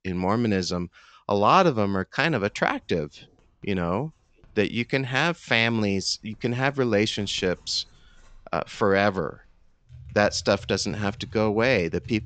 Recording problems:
high frequencies cut off; noticeable; nothing above 8 kHz
household noises; faint; throughout; 25 dB below the speech

